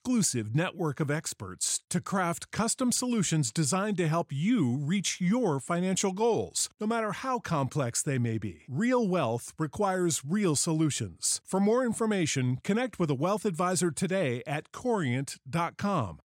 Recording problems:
none

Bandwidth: 16 kHz